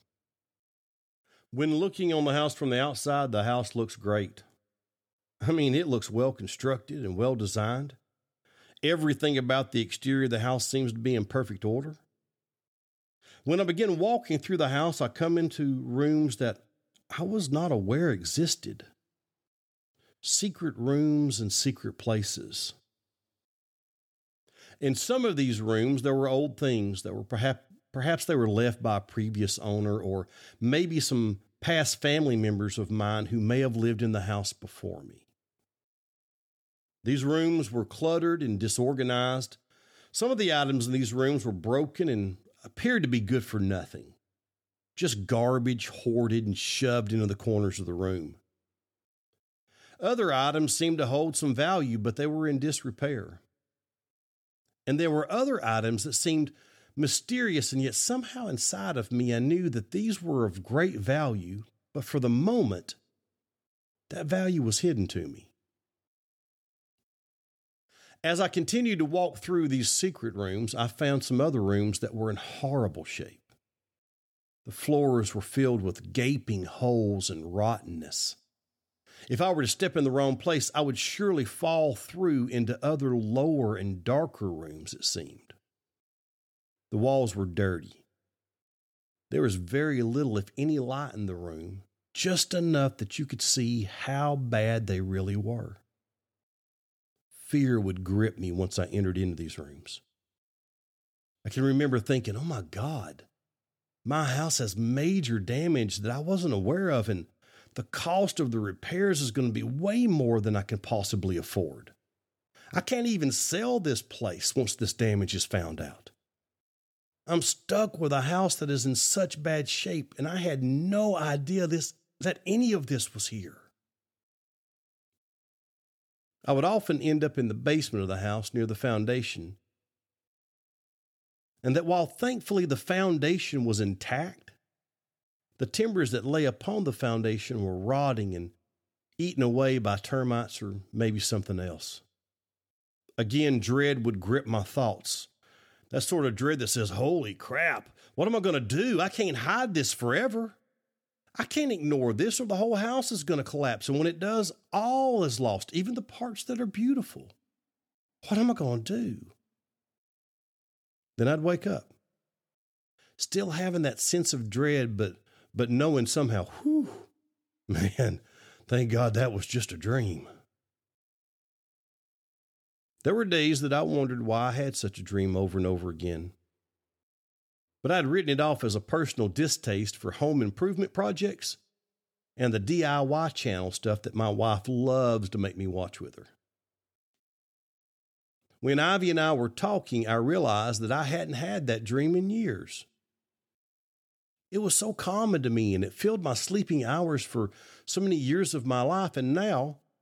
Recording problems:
none

